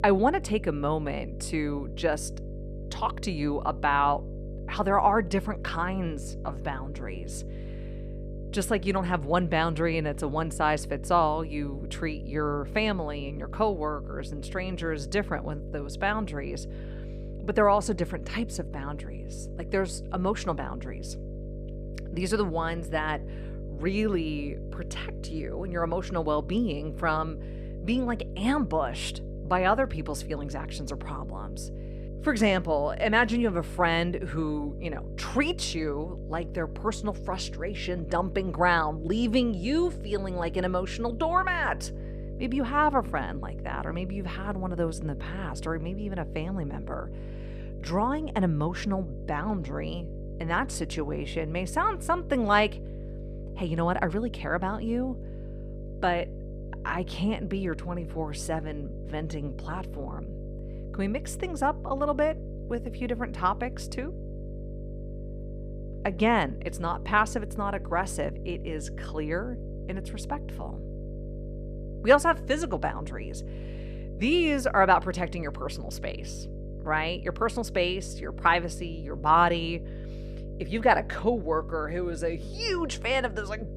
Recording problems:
electrical hum; noticeable; throughout; 50 Hz, 20 dB below the speech

